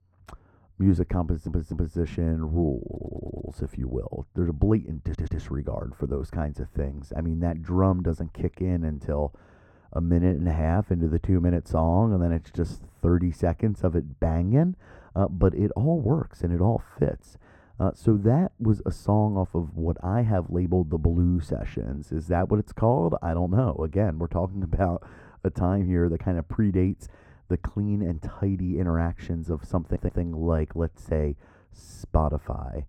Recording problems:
muffled; very; fading above 2 kHz
audio stuttering; 4 times, first at 1 s

